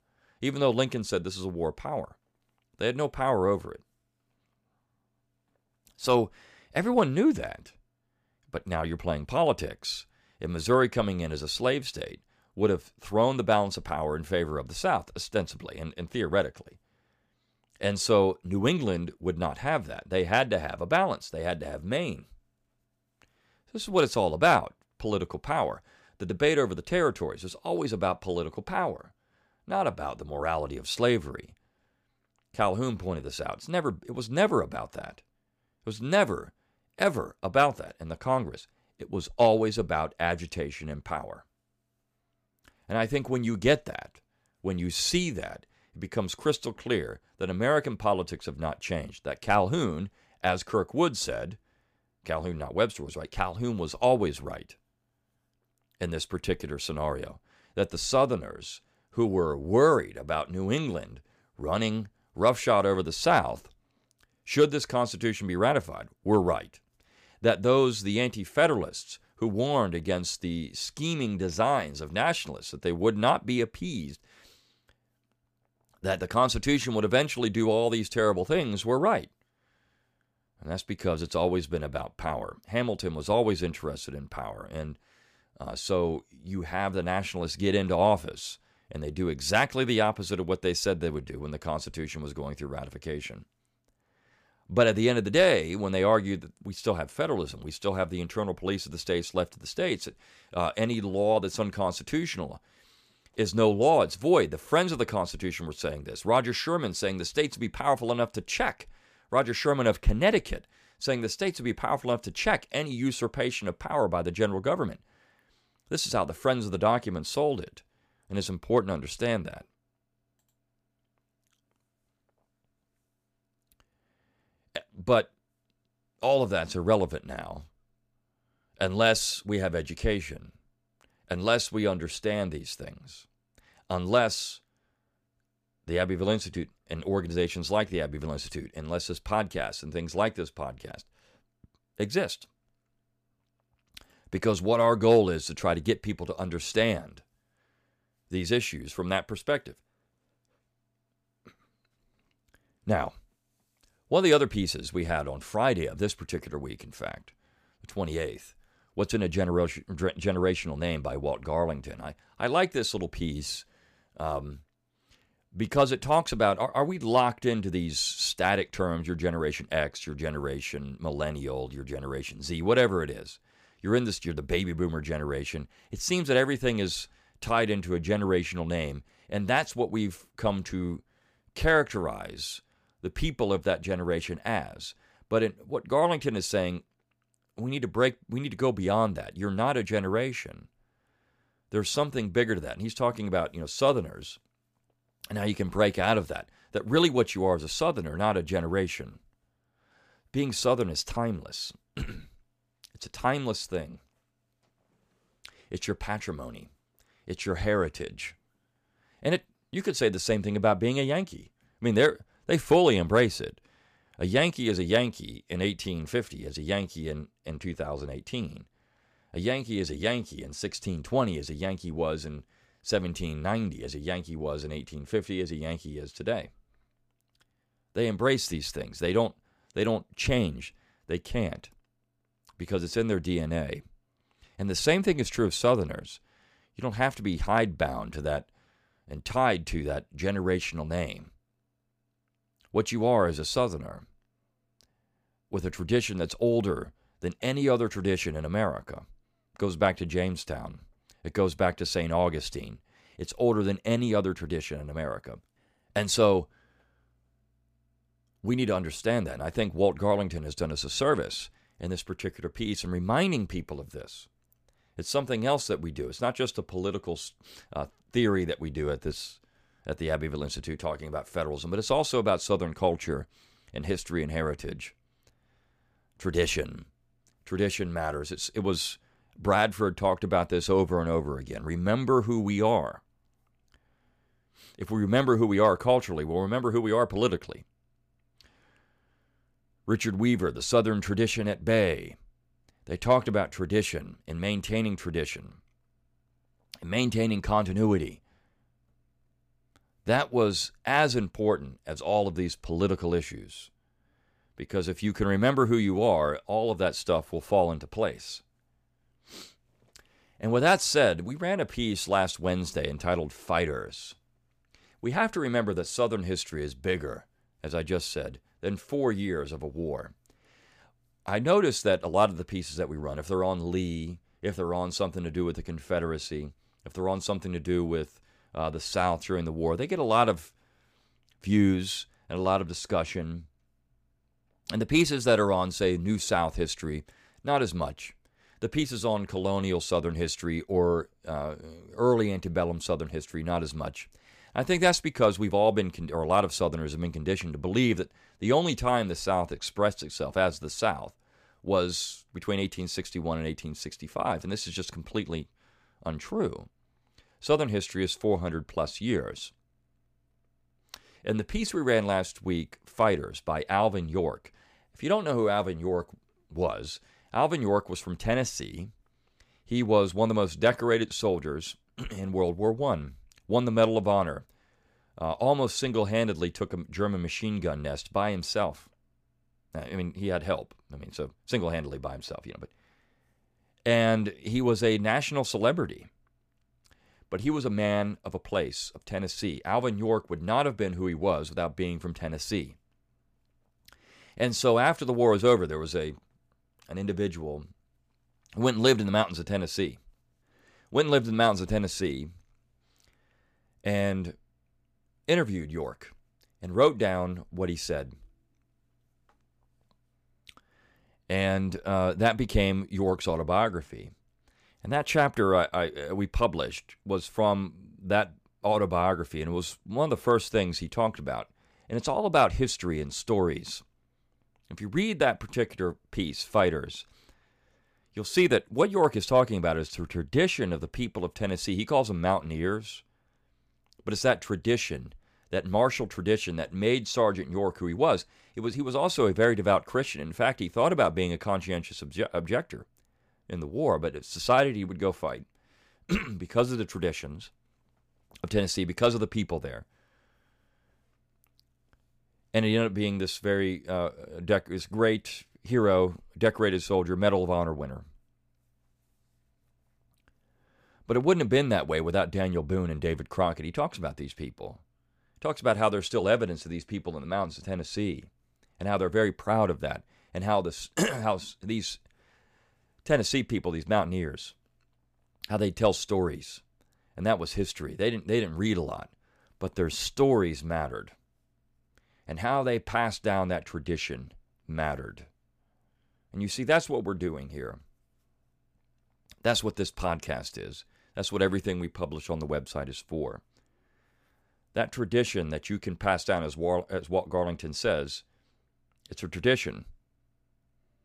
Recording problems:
none

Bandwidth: 15 kHz